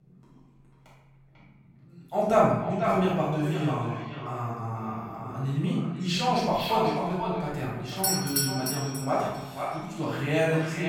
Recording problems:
echo of what is said; strong; throughout; 490 ms later, 7 dB below the speech
room echo; strong; dies away in 0.8 s
off-mic speech; far
doorbell; loud; at 8 s; peak 3 dB above the speech

